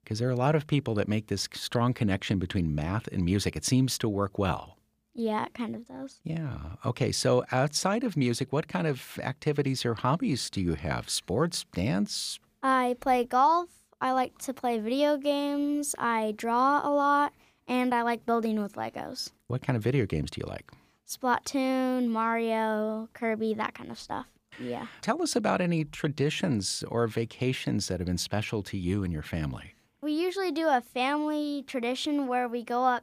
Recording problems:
none

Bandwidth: 15 kHz